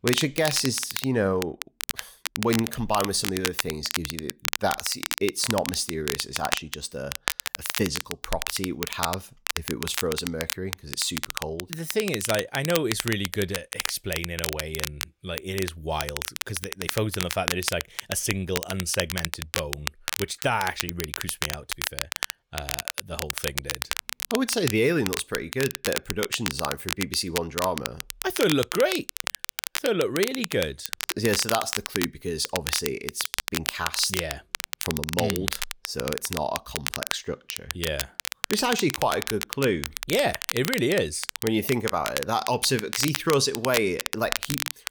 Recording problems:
crackle, like an old record; loud; 3 dB below the speech

